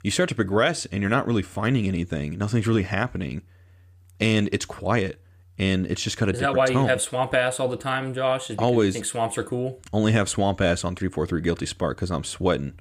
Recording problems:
none

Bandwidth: 15 kHz